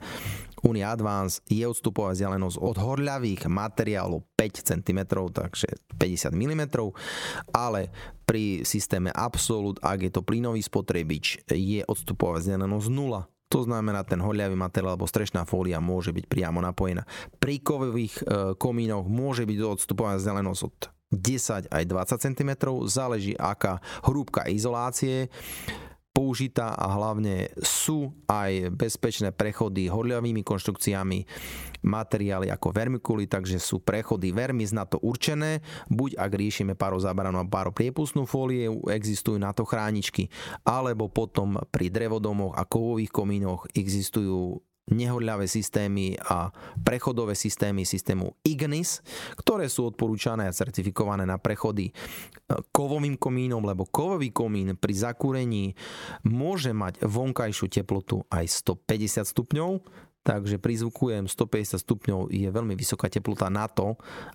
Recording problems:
squashed, flat; somewhat

